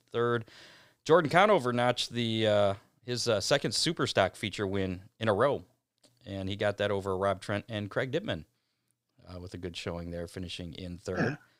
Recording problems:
none

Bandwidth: 15.5 kHz